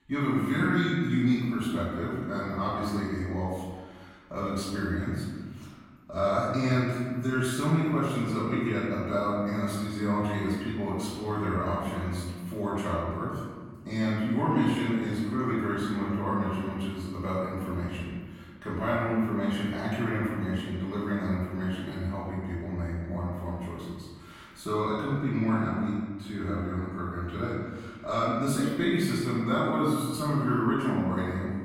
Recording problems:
room echo; strong; dies away in 1.5 s
off-mic speech; far

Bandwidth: 16.5 kHz